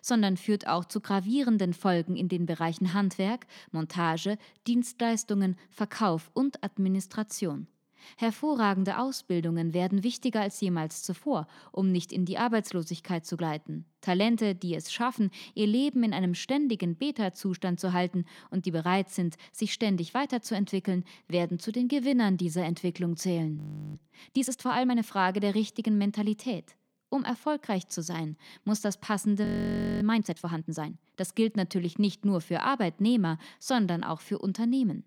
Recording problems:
audio freezing; at 24 s and at 29 s for 0.5 s

